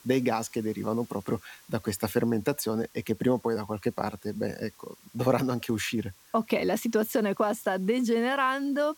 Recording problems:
hiss; faint; throughout; 25 dB below the speech

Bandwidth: 17.5 kHz